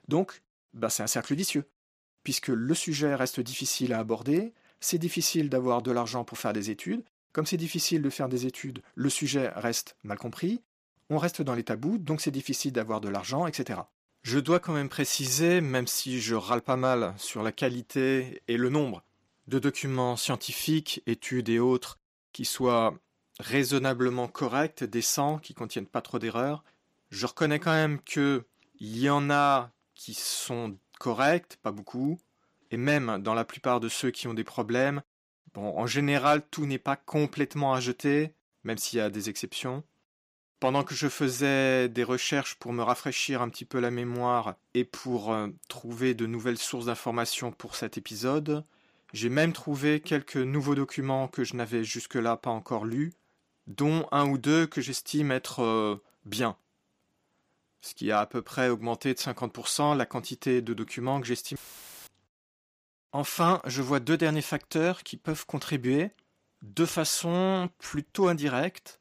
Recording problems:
audio cutting out; filled with static; at 1:02 for 0.5 s

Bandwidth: 15 kHz